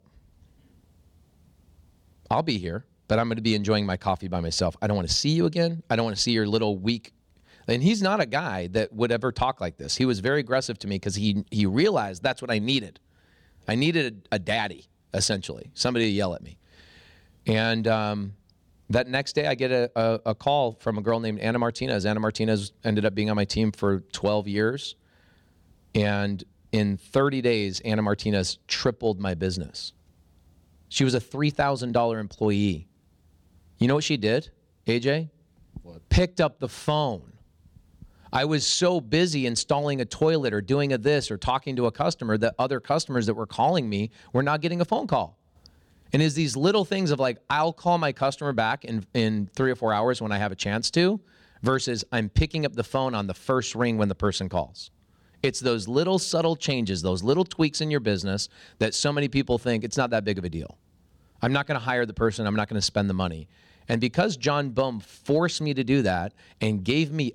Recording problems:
none

